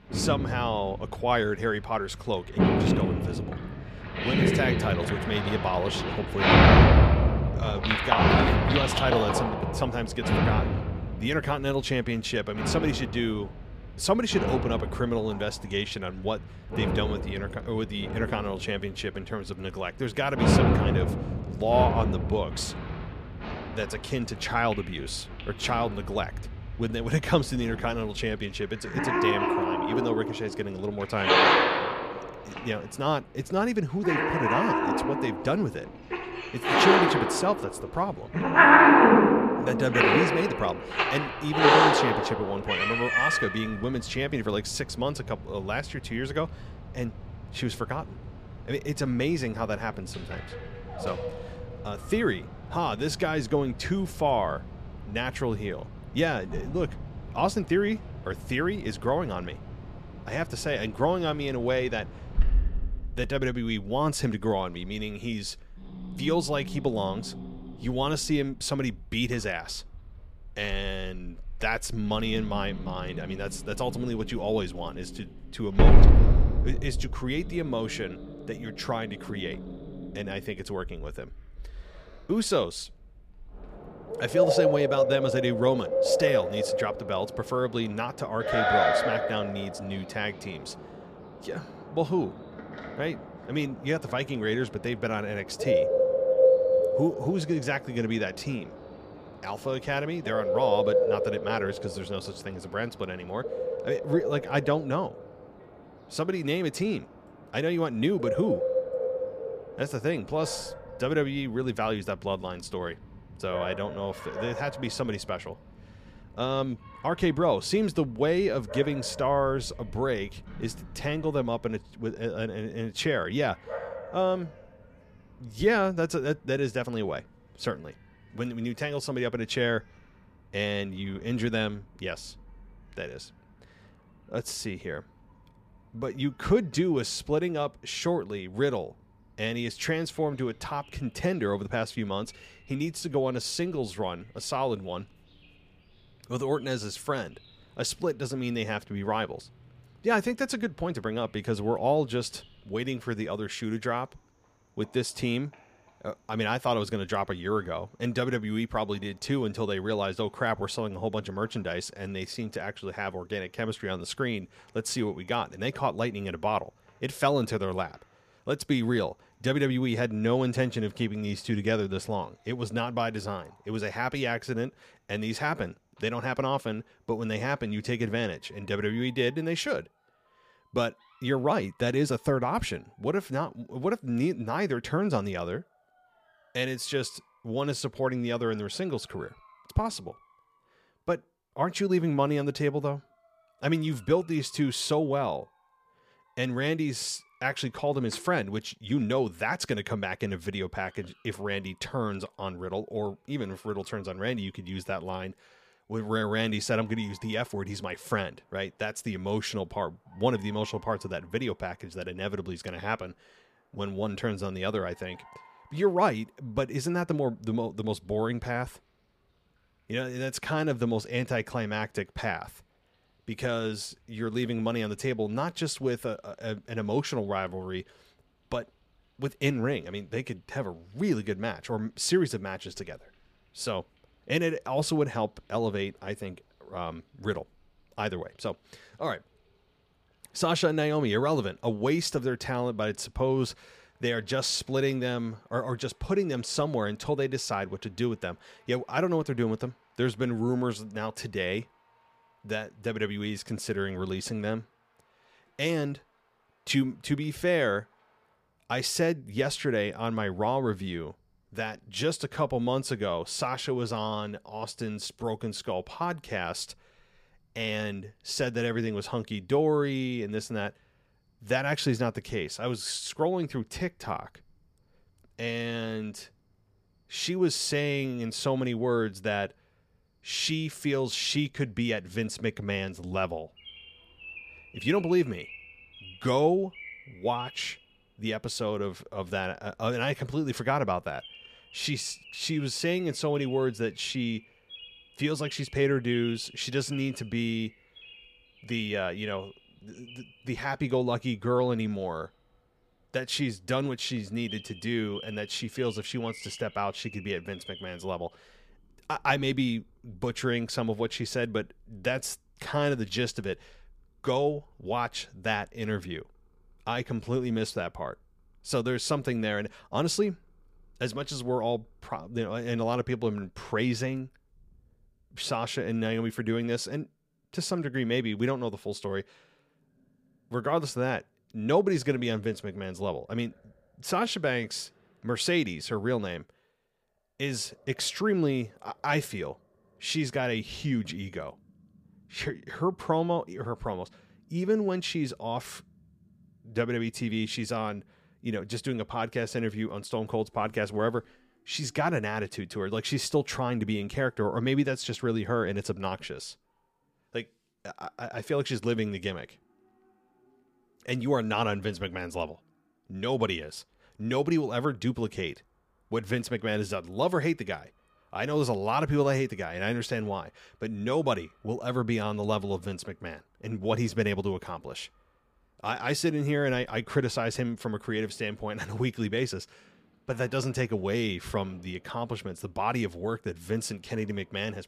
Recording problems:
animal sounds; very loud; throughout; 3 dB above the speech

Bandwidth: 15 kHz